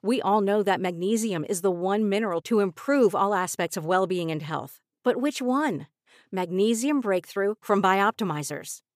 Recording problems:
none

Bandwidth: 15 kHz